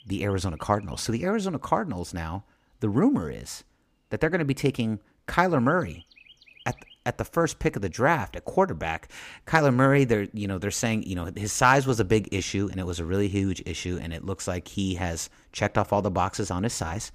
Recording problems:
animal sounds; faint; throughout; 25 dB below the speech

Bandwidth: 15 kHz